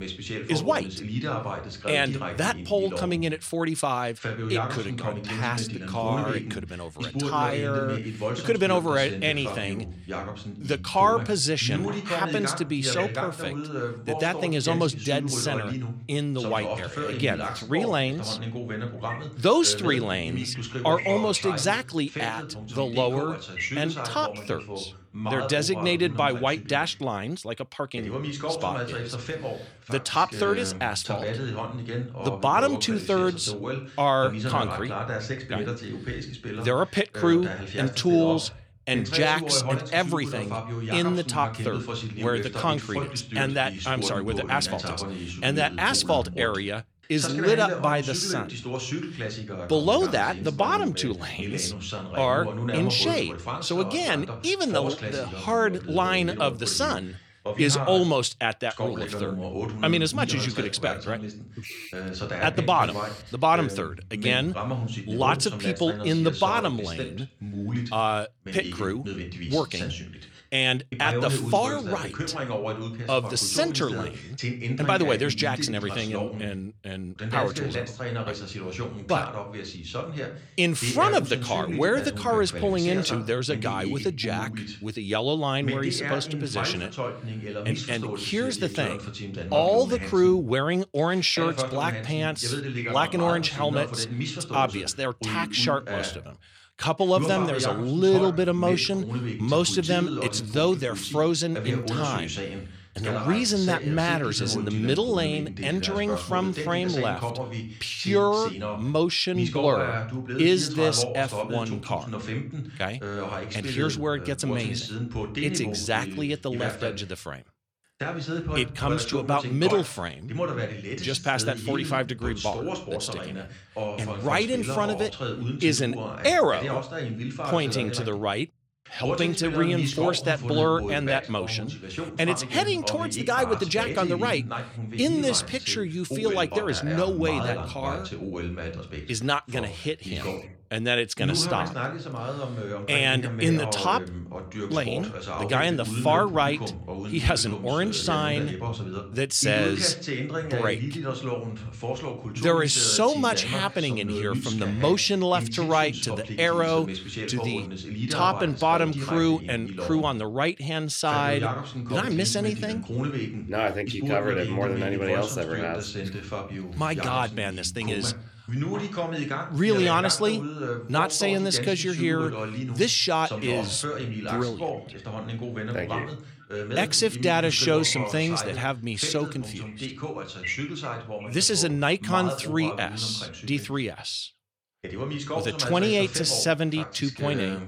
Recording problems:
voice in the background; loud; throughout; 7 dB below the speech

